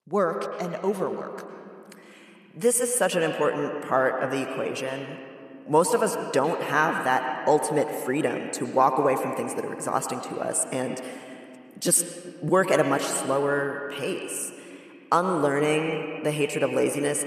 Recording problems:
echo of what is said; strong; throughout; 100 ms later, 7 dB below the speech

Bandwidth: 13.5 kHz